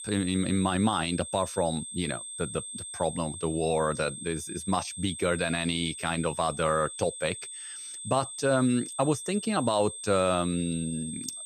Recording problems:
high-pitched whine; loud; throughout; 8.5 kHz, 8 dB below the speech

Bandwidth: 15 kHz